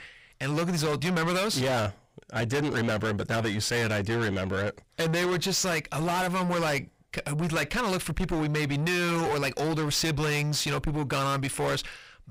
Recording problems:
distortion; heavy; 5 dB below the speech

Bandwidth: 15.5 kHz